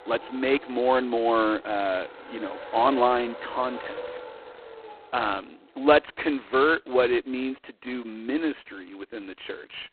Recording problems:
phone-call audio; poor line; nothing above 4 kHz
traffic noise; noticeable; throughout; 15 dB below the speech

